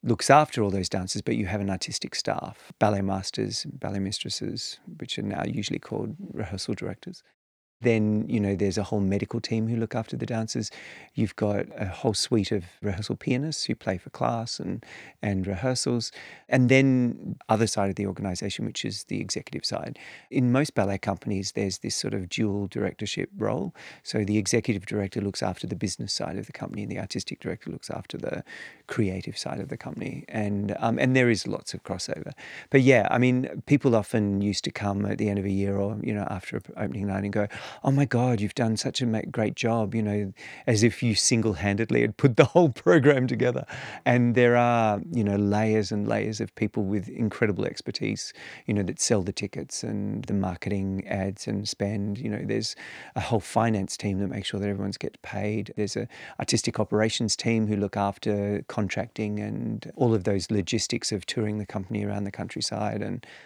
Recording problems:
none

